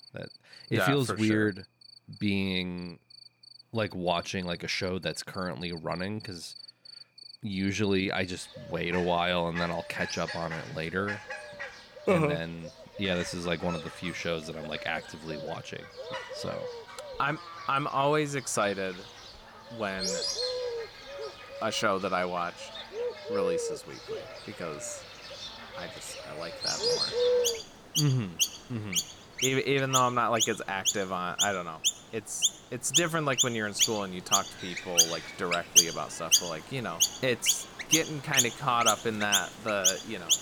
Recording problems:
animal sounds; very loud; throughout; 2 dB above the speech

